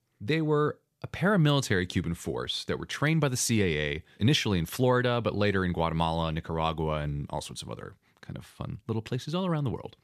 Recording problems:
none

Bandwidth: 14.5 kHz